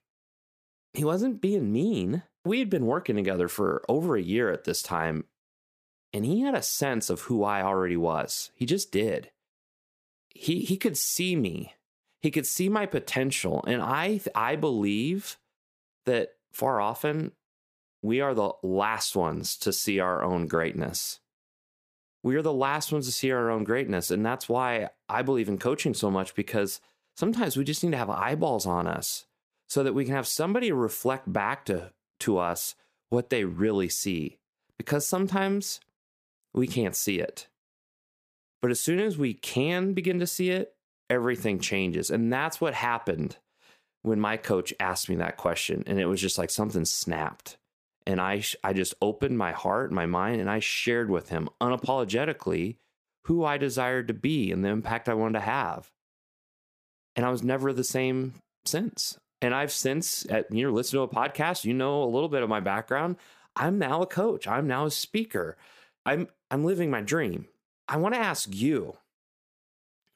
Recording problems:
none

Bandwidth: 15 kHz